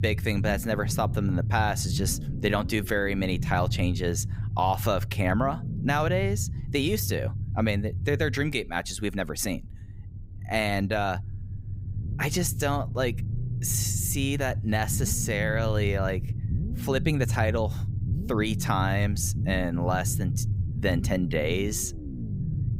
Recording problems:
low rumble; noticeable; throughout; 15 dB below the speech

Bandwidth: 15.5 kHz